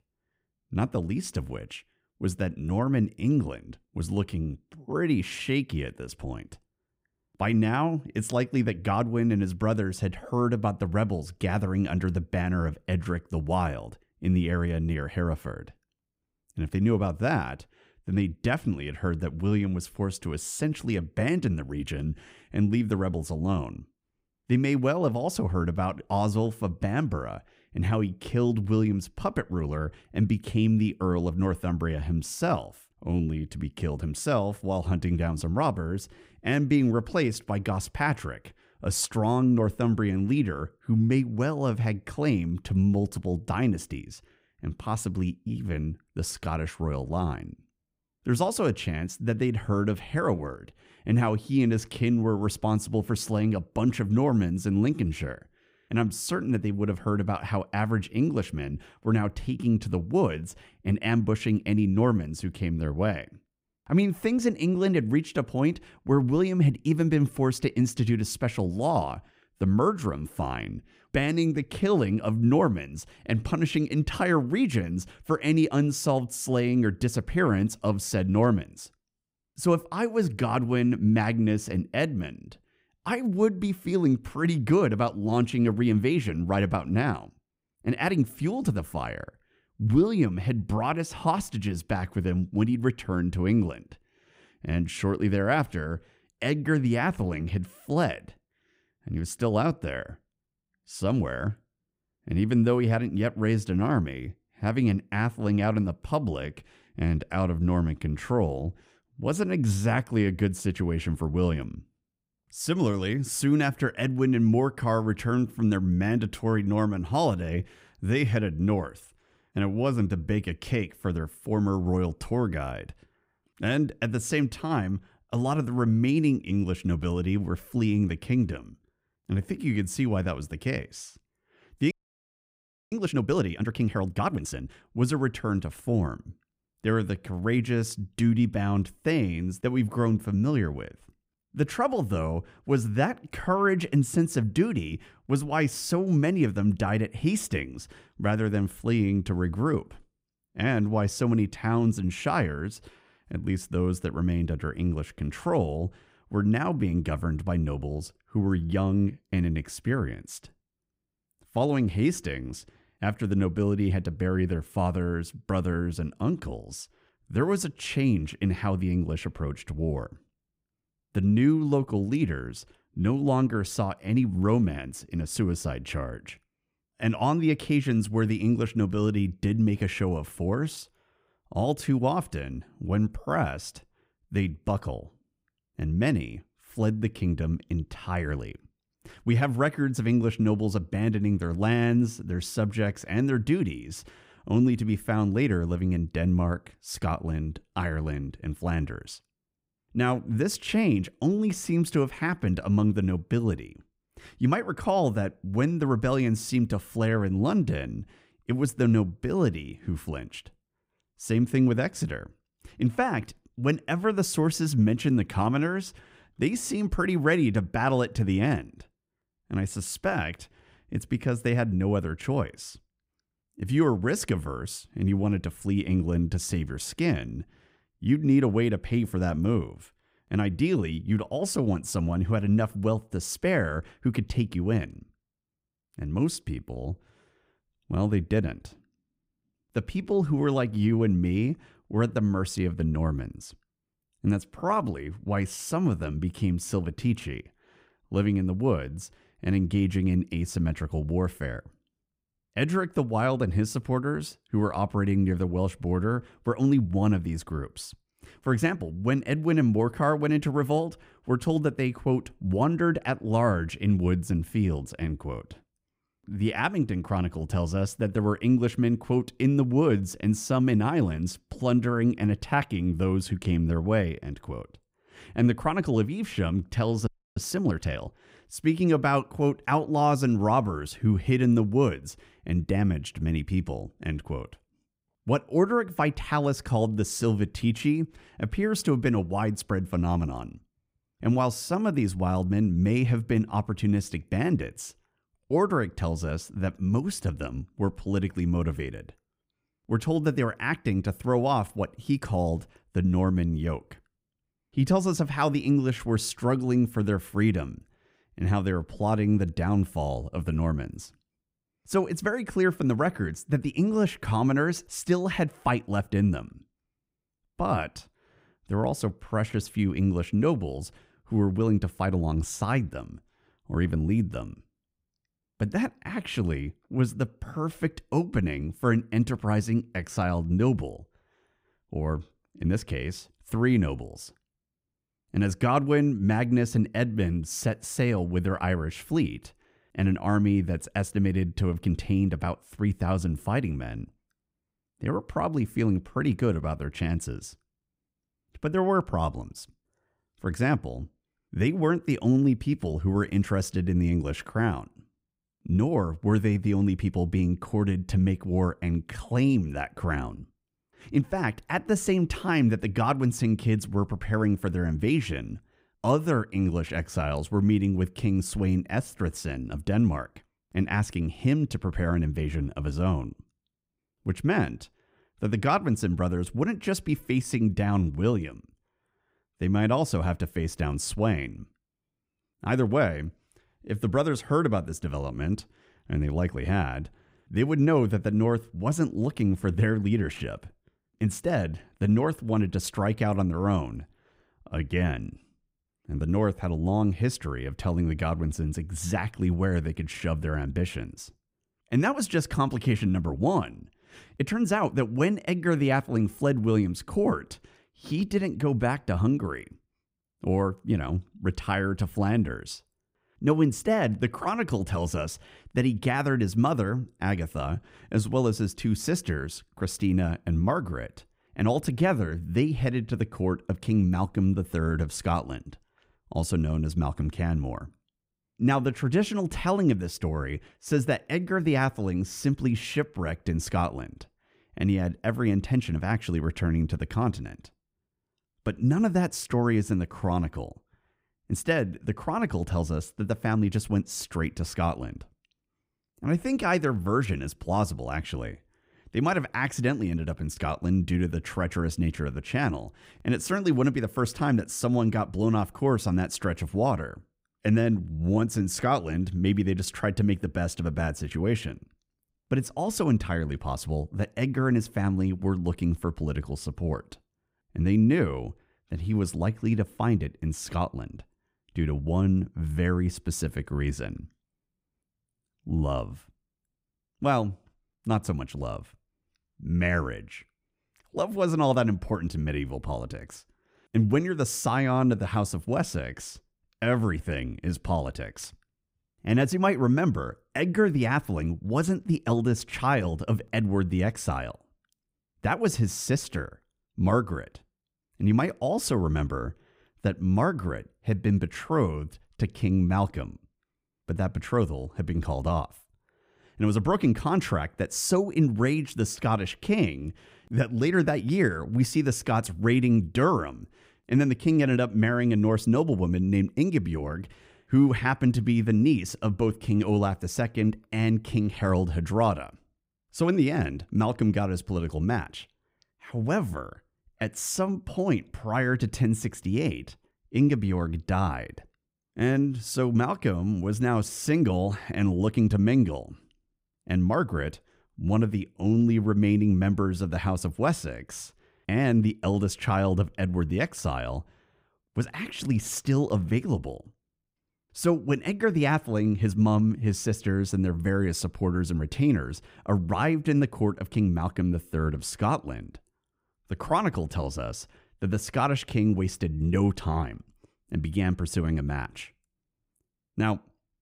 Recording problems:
audio freezing; at 2:12 for 1 s and at 4:37

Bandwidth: 15.5 kHz